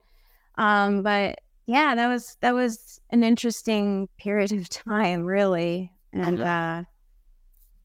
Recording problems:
none

